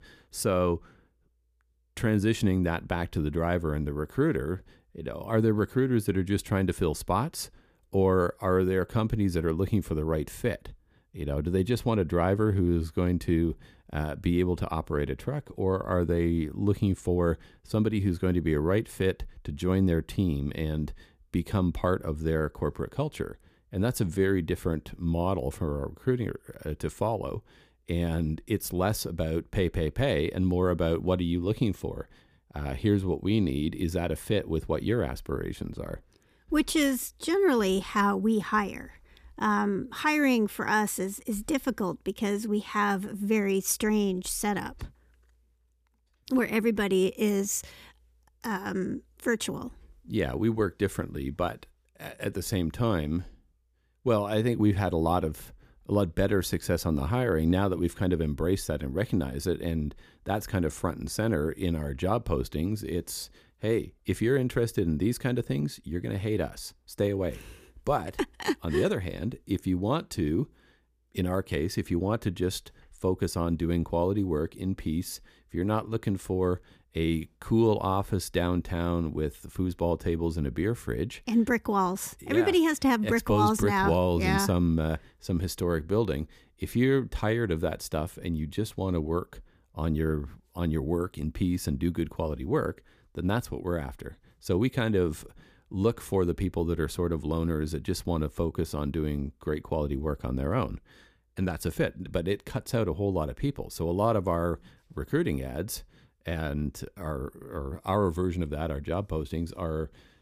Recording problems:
none

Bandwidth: 15 kHz